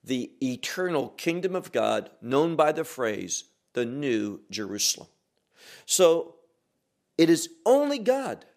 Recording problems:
none

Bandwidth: 14.5 kHz